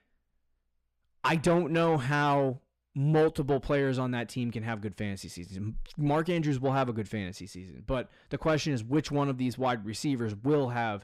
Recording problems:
distortion; slight; 10 dB below the speech

